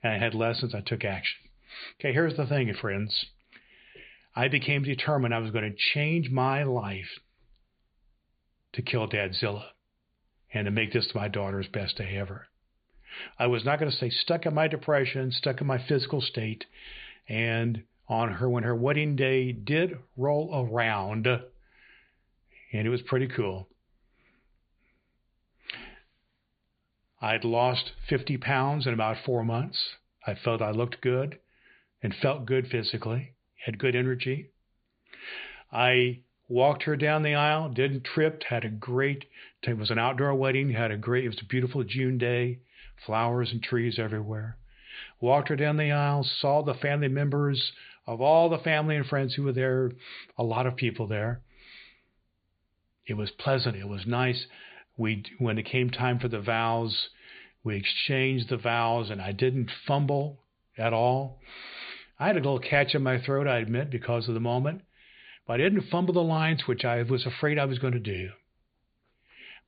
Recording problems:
high frequencies cut off; severe; nothing above 4.5 kHz

